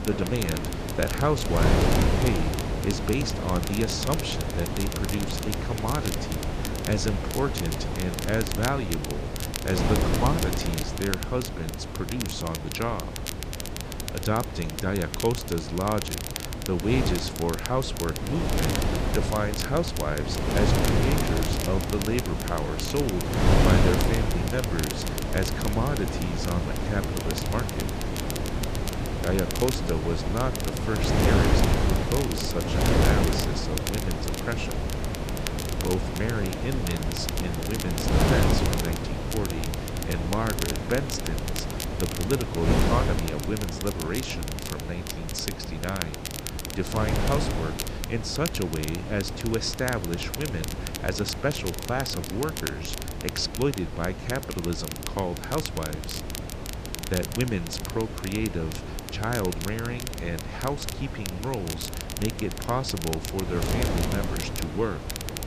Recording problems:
wind noise on the microphone; heavy; 1 dB below the speech
crackle, like an old record; loud; 7 dB below the speech
rain or running water; very faint; throughout; 20 dB below the speech

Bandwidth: 14.5 kHz